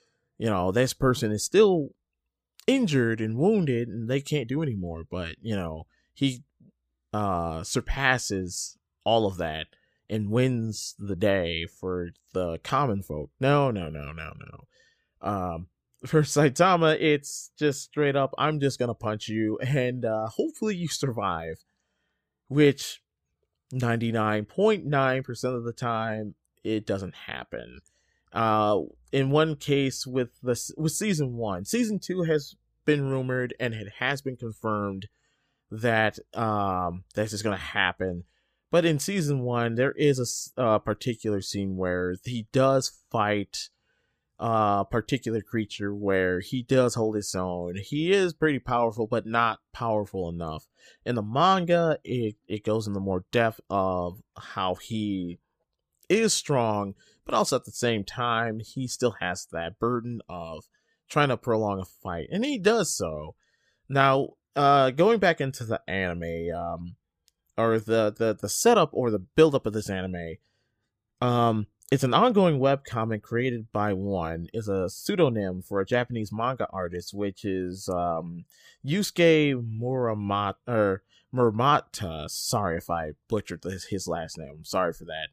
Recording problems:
none

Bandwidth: 15 kHz